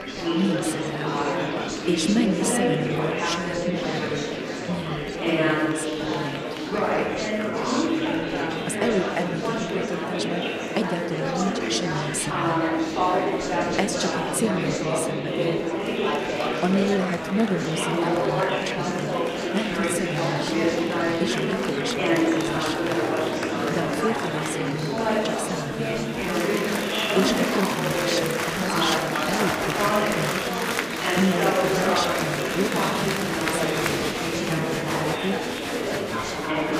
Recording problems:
murmuring crowd; very loud; throughout; 5 dB above the speech

